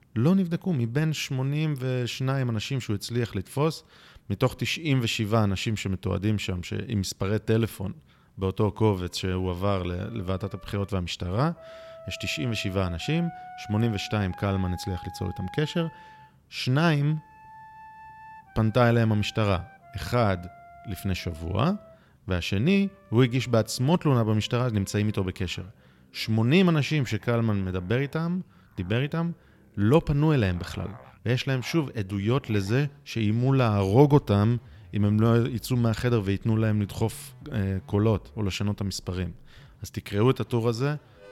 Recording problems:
background music; faint; from 9.5 s on; 25 dB below the speech

